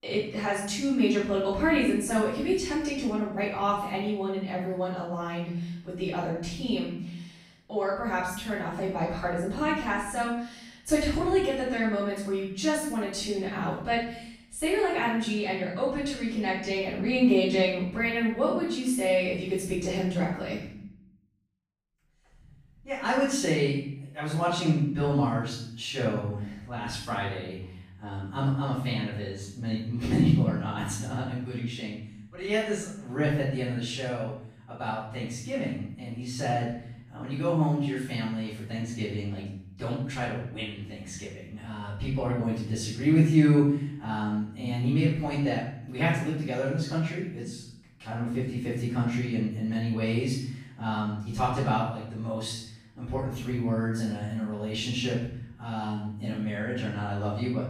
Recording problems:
off-mic speech; far
room echo; noticeable; dies away in 0.7 s

